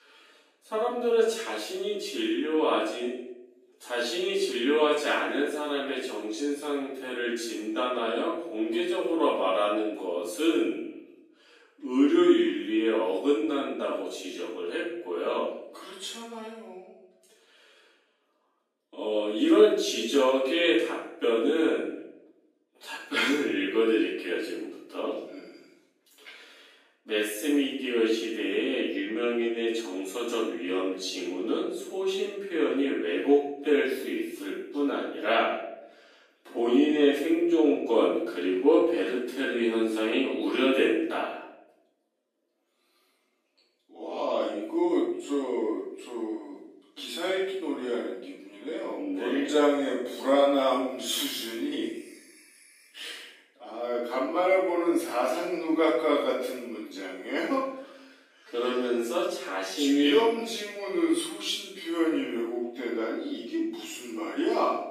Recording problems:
off-mic speech; far
wrong speed, natural pitch; too slow; 0.6 times normal speed
room echo; noticeable; dies away in 0.7 s
thin; very slightly; fading below 300 Hz

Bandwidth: 15 kHz